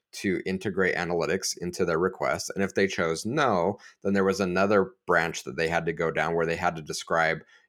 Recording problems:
none

